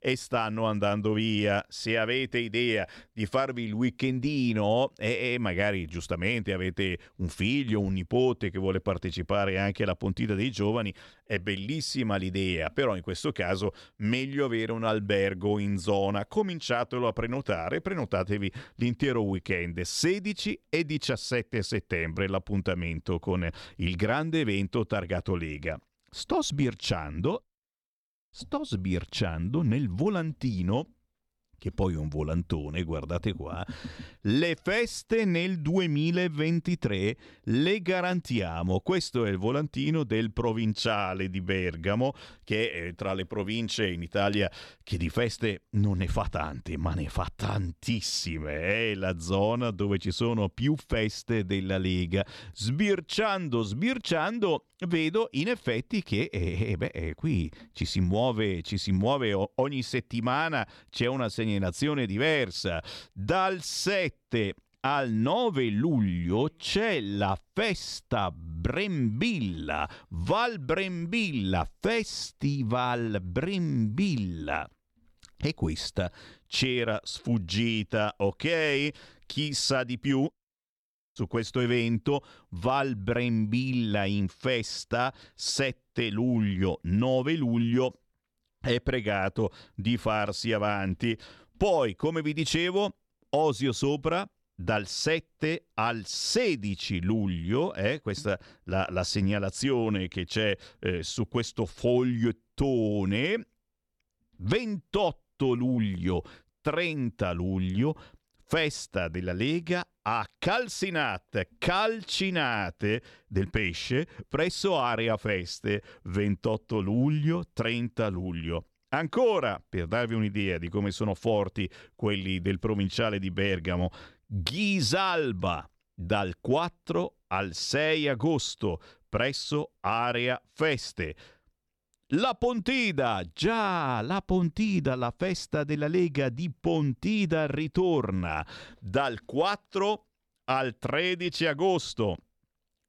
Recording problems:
none

